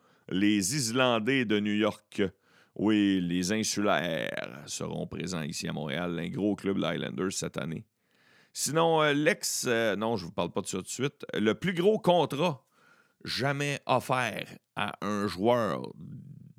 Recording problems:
none

